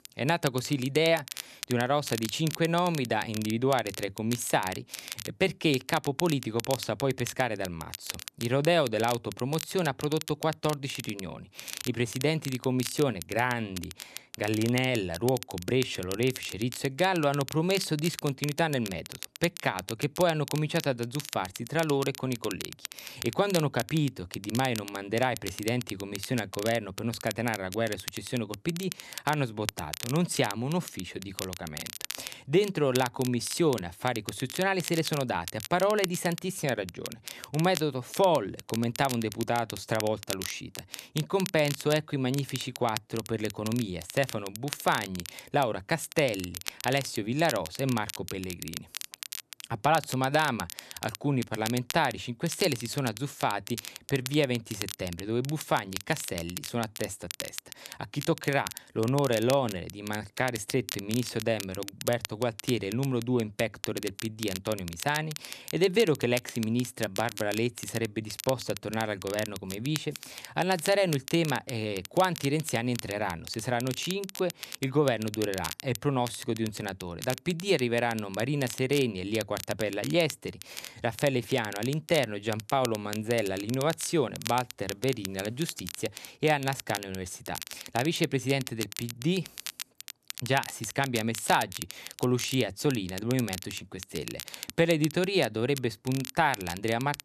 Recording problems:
crackle, like an old record; noticeable; 10 dB below the speech

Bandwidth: 14 kHz